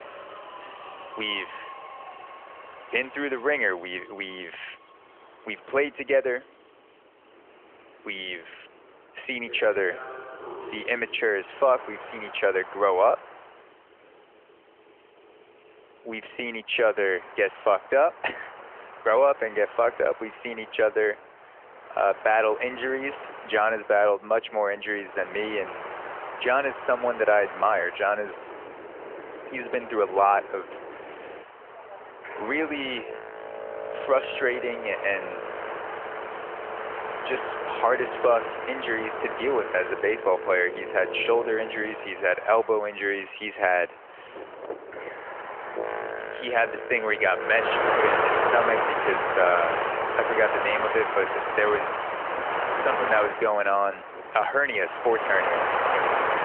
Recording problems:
phone-call audio; nothing above 3 kHz
train or aircraft noise; loud; throughout; 5 dB below the speech

